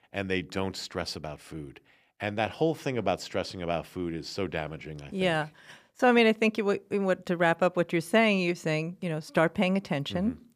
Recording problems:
none

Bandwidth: 15 kHz